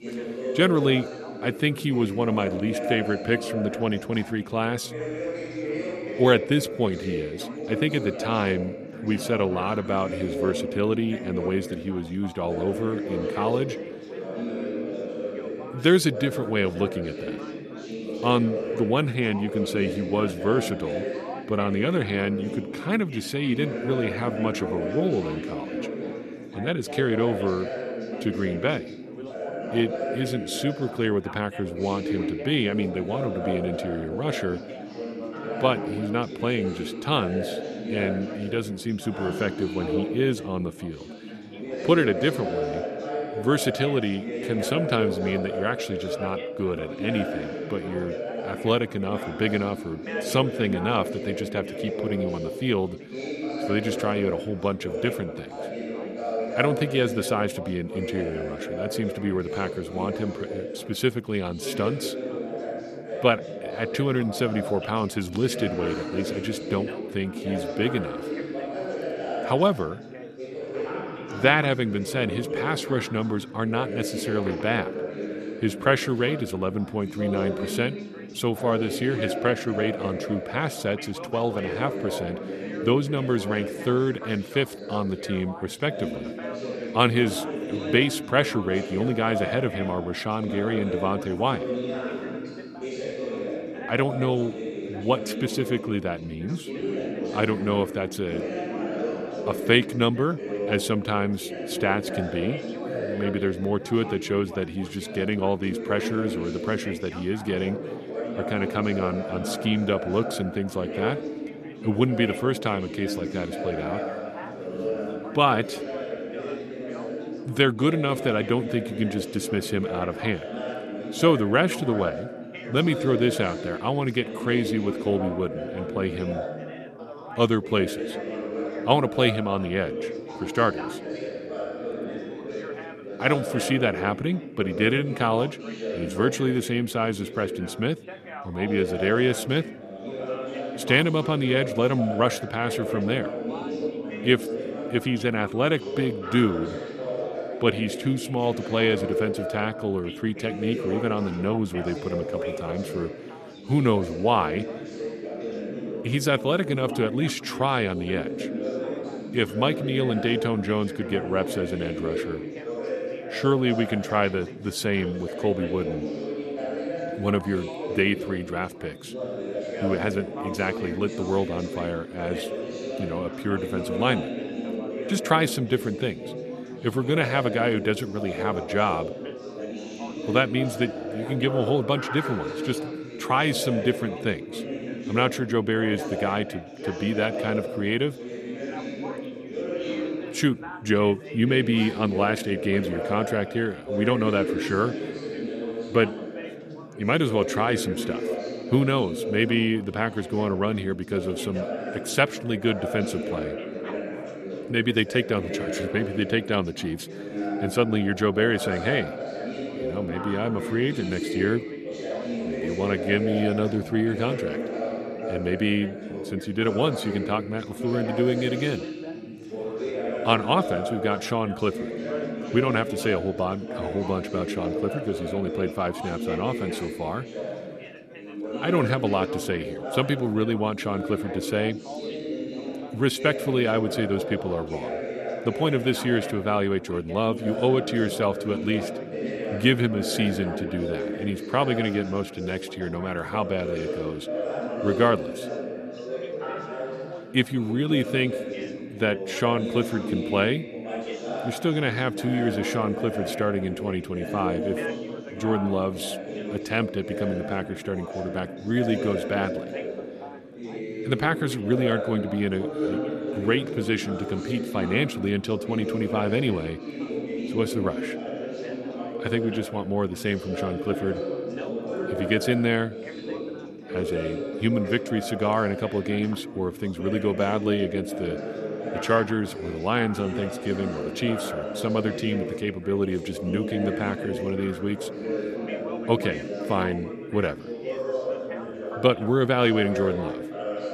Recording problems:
background chatter; loud; throughout; 4 voices, 6 dB below the speech

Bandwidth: 13.5 kHz